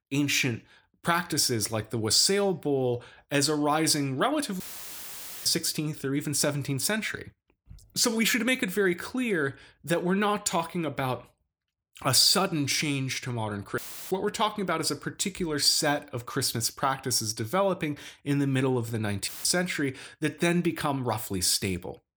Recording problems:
audio cutting out; filled with static; at 4.5 s for 1 s, at 14 s and at 19 s

